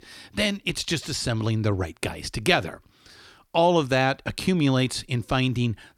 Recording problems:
none

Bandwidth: 18 kHz